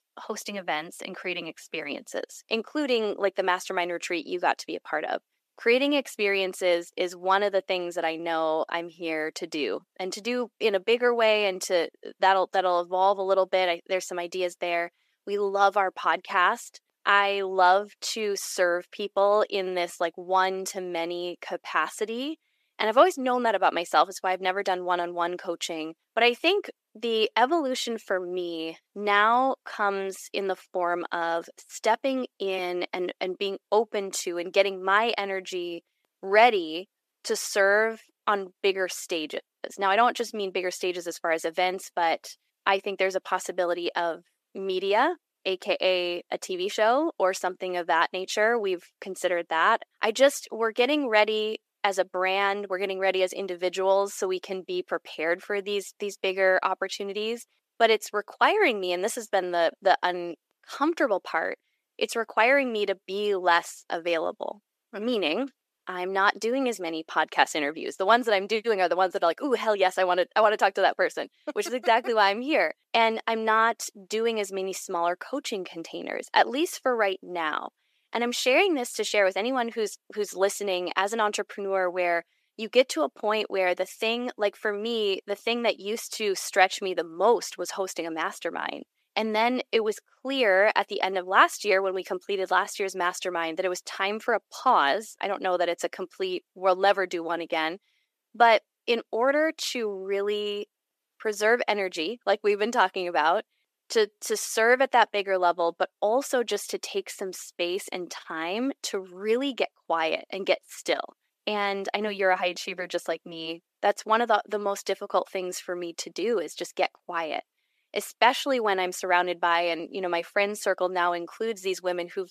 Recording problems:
thin; somewhat; fading below 400 Hz

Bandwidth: 14.5 kHz